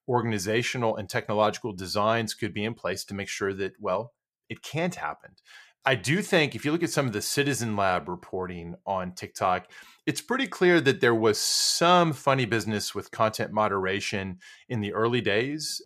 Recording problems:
none

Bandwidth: 14.5 kHz